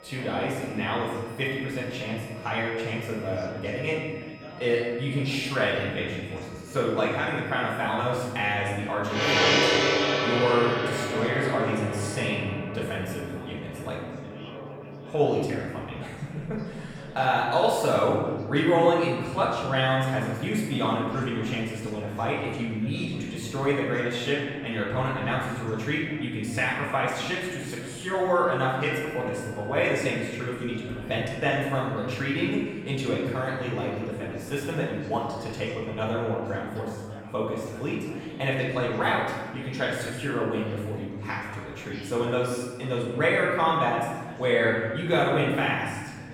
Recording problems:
off-mic speech; far
room echo; noticeable; dies away in 1.3 s
background music; loud; throughout; 1 dB below the speech
chatter from many people; noticeable; throughout; 15 dB below the speech

